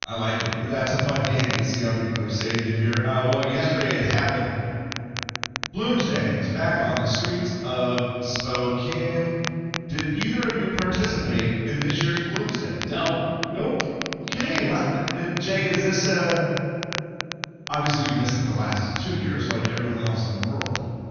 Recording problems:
room echo; strong; dies away in 2.6 s
off-mic speech; far
high frequencies cut off; noticeable; nothing above 6.5 kHz
crackle, like an old record; very faint; 8 dB below the speech

